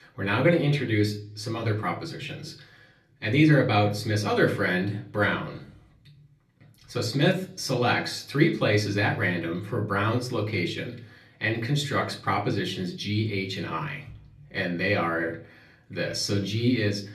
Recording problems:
off-mic speech; far
room echo; slight; dies away in 0.4 s

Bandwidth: 13.5 kHz